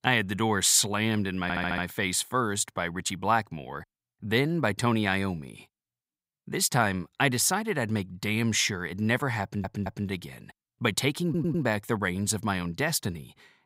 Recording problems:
audio stuttering; at 1.5 s, at 9.5 s and at 11 s

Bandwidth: 15.5 kHz